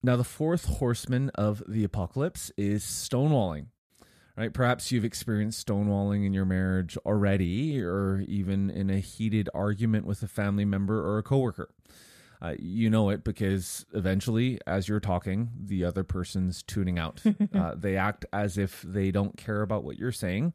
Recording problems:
none

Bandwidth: 14.5 kHz